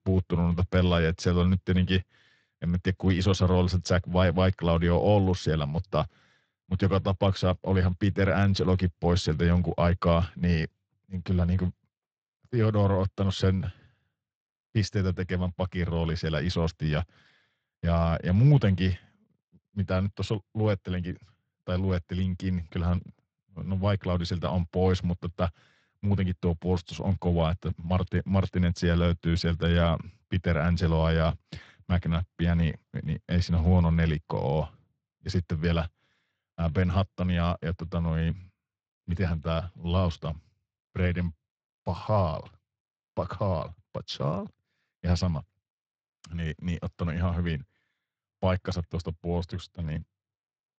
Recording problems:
garbled, watery; slightly; nothing above 7.5 kHz

